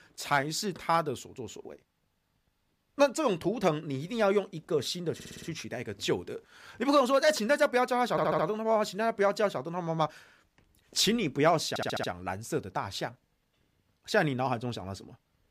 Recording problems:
audio stuttering; at 5 s, at 8 s and at 12 s

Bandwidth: 15 kHz